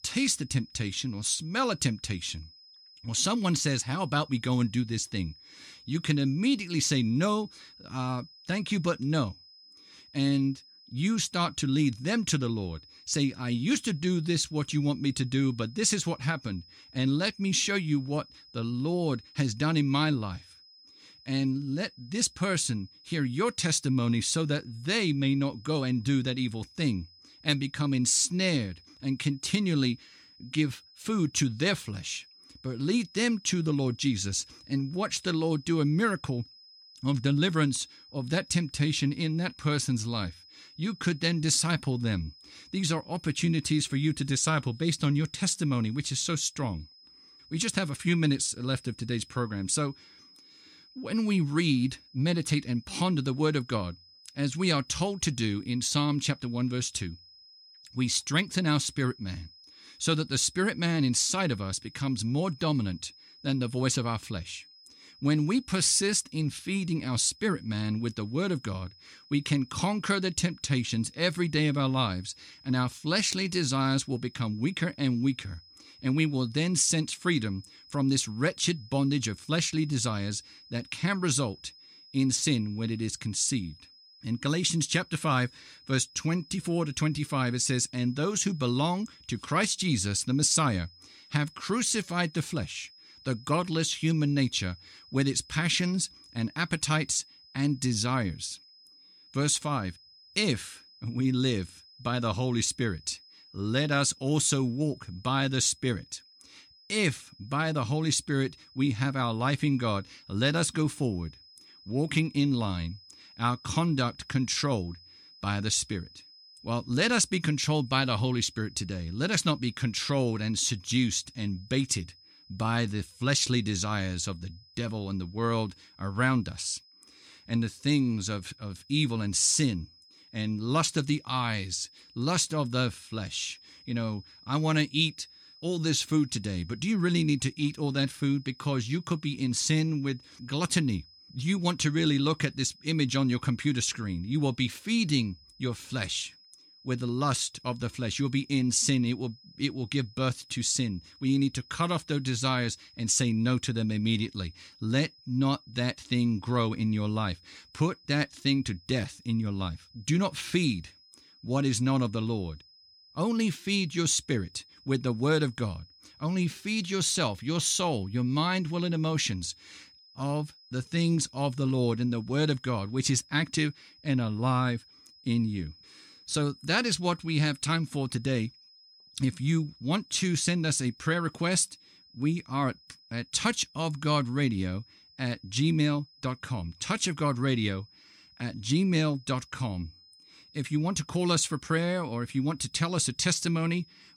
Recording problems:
high-pitched whine; faint; throughout; 5 kHz, 25 dB below the speech

